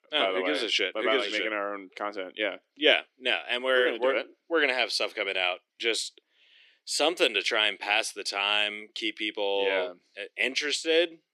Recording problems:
thin; very; fading below 300 Hz

